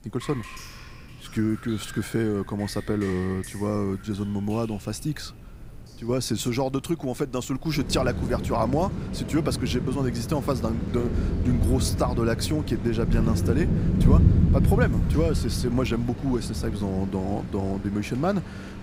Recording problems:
rain or running water; very loud; throughout; 1 dB above the speech

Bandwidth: 15.5 kHz